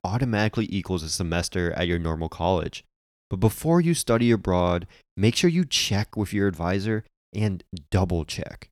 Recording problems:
none

